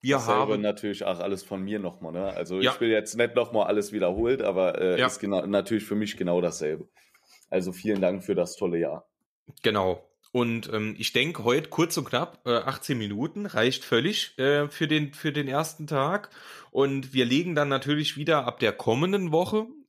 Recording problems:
none

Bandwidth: 14.5 kHz